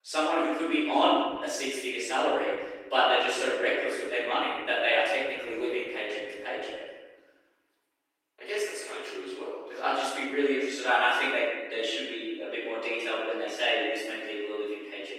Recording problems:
echo of what is said; strong; throughout; 150 ms later, 10 dB below the speech
room echo; strong; dies away in 0.9 s
off-mic speech; far
garbled, watery; slightly; nothing above 16 kHz
thin; very slightly; fading below 300 Hz

